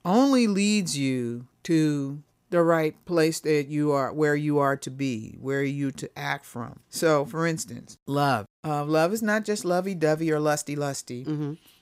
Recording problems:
none

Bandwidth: 15.5 kHz